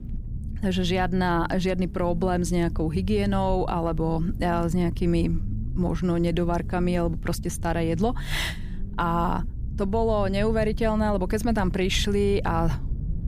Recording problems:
low rumble; noticeable; throughout; 20 dB below the speech

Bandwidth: 15 kHz